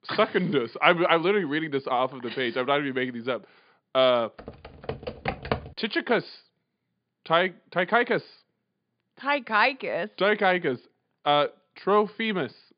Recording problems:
high frequencies cut off; severe; nothing above 5 kHz
keyboard typing; noticeable; from 4.5 to 5.5 s; peak 5 dB below the speech

